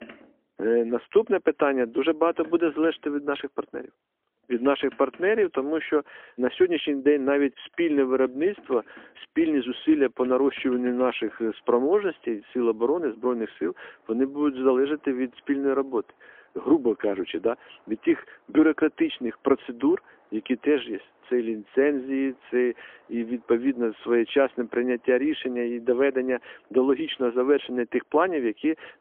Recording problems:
phone-call audio; poor line; nothing above 3.5 kHz
traffic noise; faint; throughout; 30 dB below the speech

